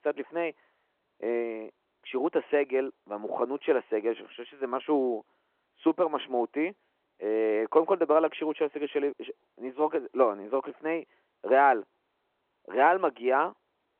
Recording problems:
phone-call audio

